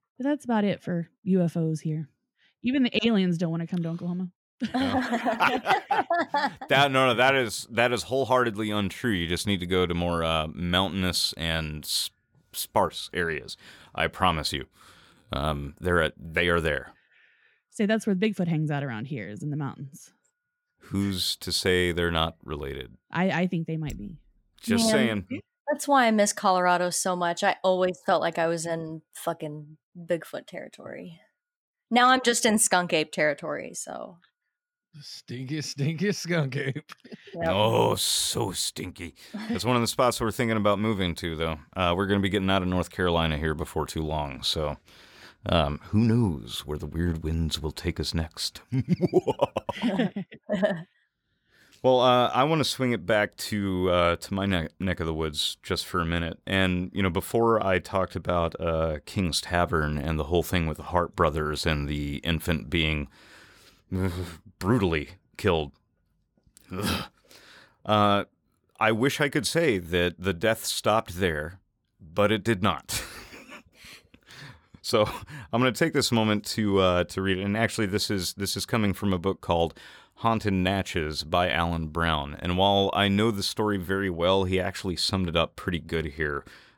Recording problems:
none

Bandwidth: 18 kHz